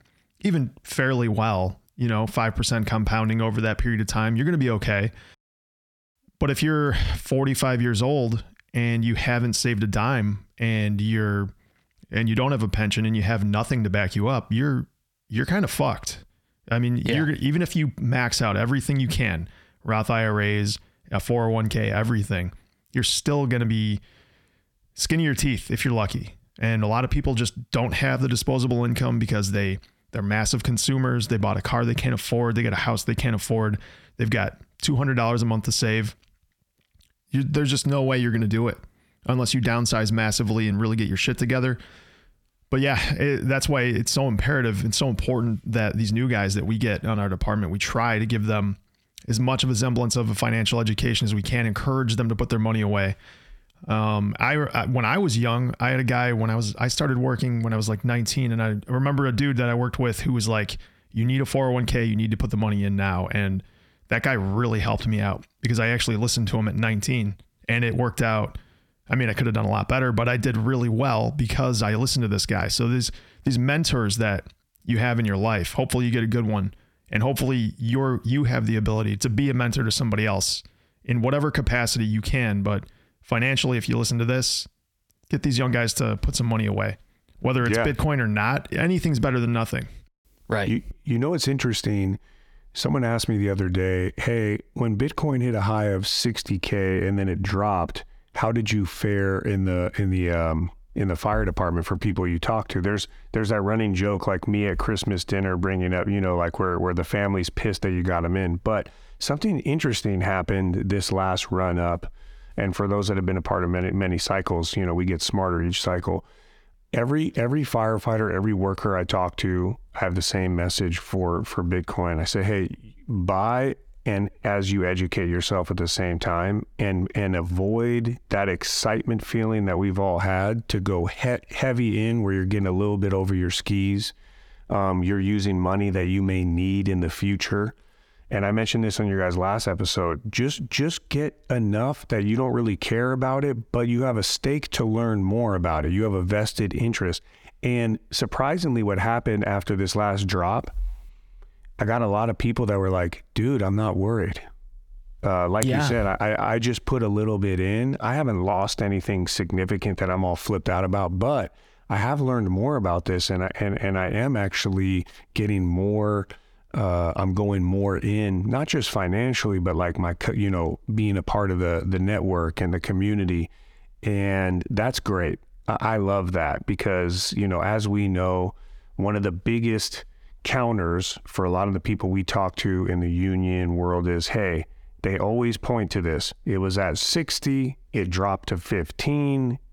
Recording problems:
squashed, flat; heavily

